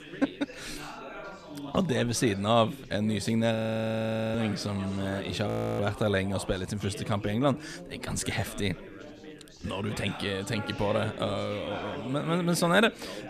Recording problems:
chatter from many people; noticeable; throughout; 15 dB below the speech
audio freezing; at 3.5 s for 1 s and at 5.5 s

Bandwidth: 14.5 kHz